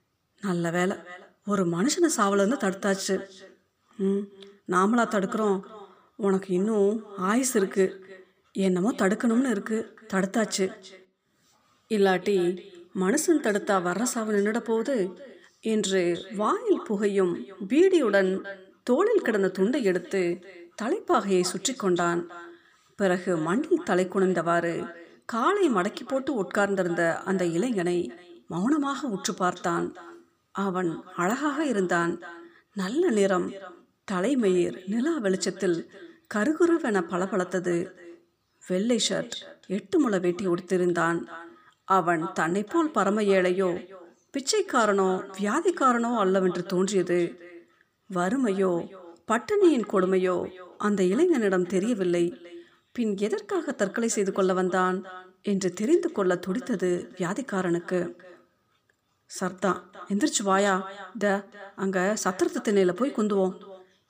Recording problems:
echo of what is said; faint; throughout; 310 ms later, 20 dB below the speech

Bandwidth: 15 kHz